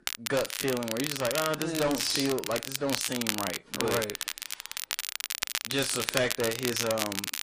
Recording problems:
distortion; slight; 7% of the sound clipped
garbled, watery; slightly; nothing above 11 kHz
crackle, like an old record; loud; 2 dB below the speech

